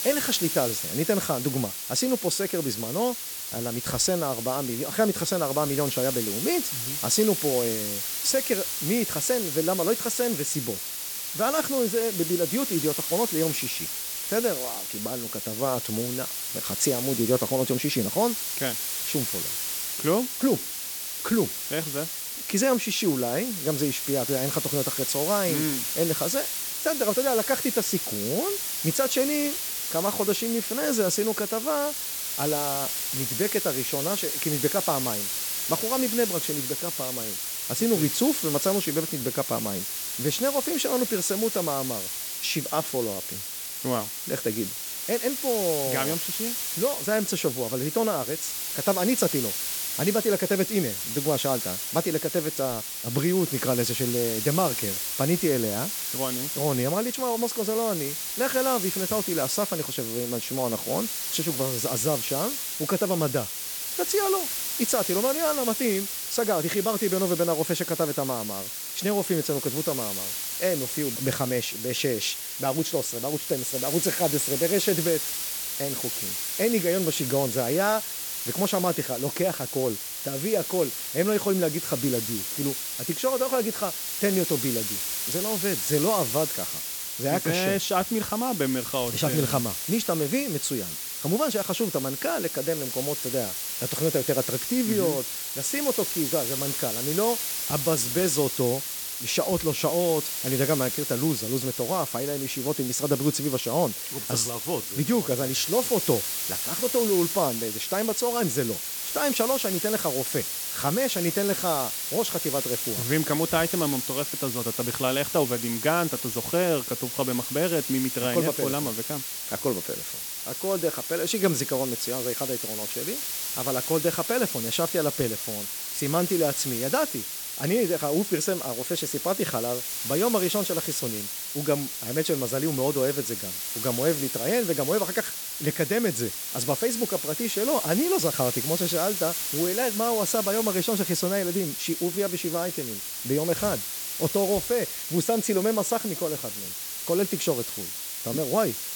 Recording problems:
hiss; loud; throughout; 1 dB below the speech

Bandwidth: 18.5 kHz